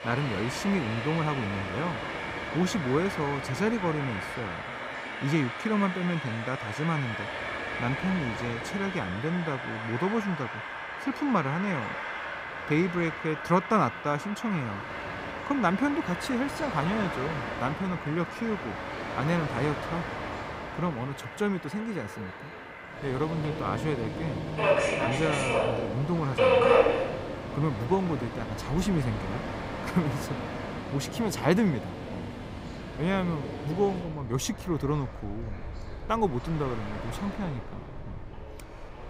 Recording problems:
train or aircraft noise; loud; throughout; 3 dB below the speech
voice in the background; noticeable; throughout; 20 dB below the speech

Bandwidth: 15.5 kHz